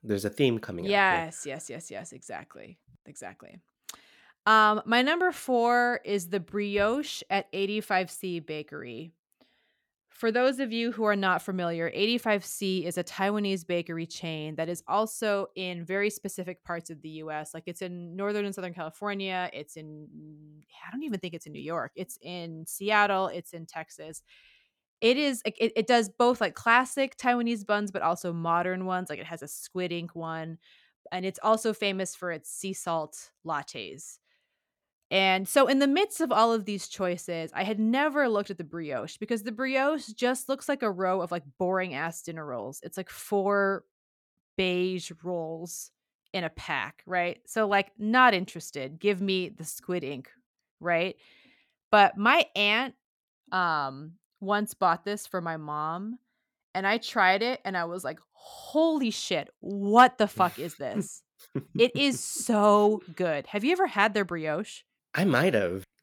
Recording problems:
none

